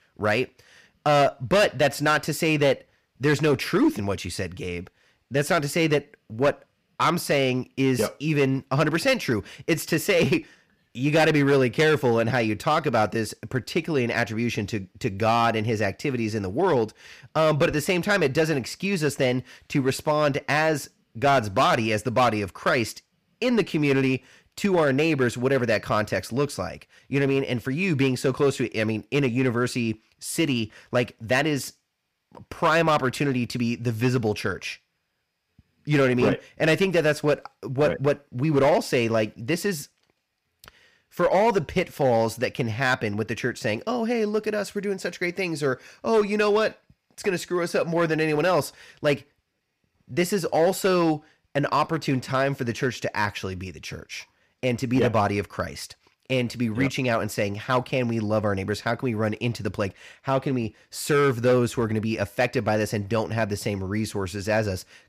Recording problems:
distortion; slight; 4% of the sound clipped

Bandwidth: 15 kHz